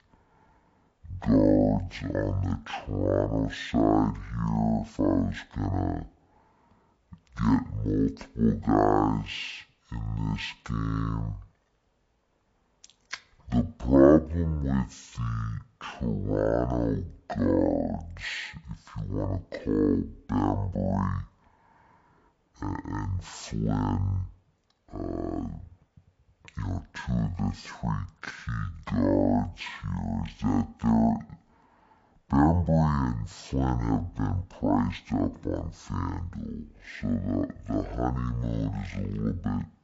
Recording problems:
wrong speed and pitch; too slow and too low; 0.5 times normal speed

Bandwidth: 7.5 kHz